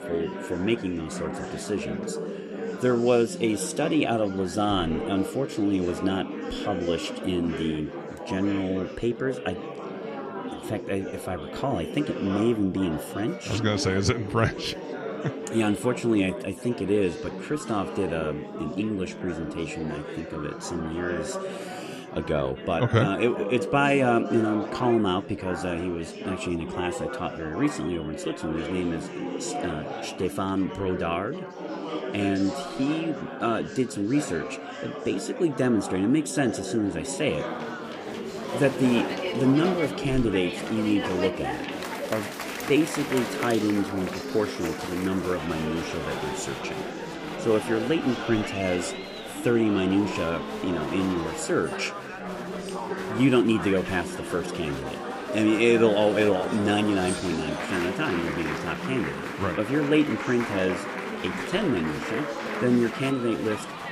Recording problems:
chatter from many people; loud; throughout; 6 dB below the speech

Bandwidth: 15 kHz